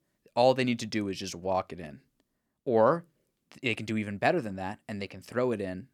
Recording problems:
none

